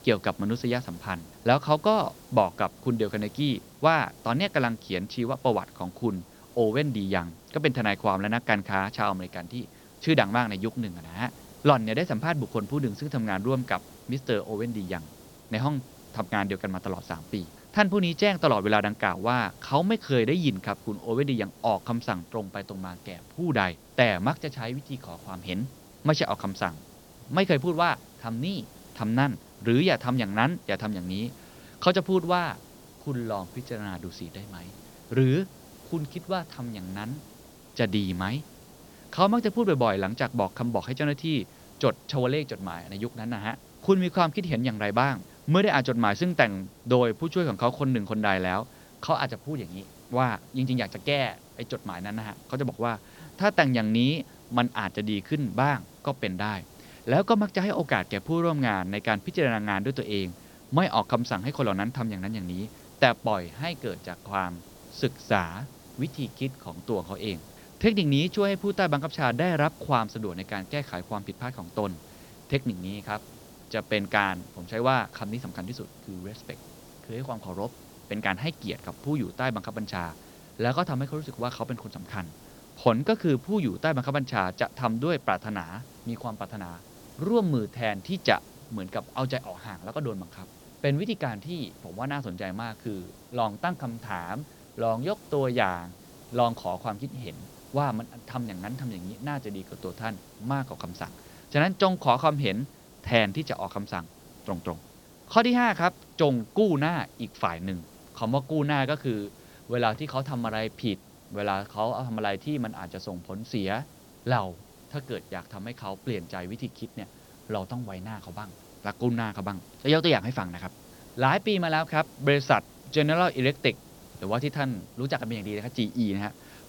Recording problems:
high frequencies cut off; noticeable; nothing above 6 kHz
hiss; faint; throughout; 20 dB below the speech

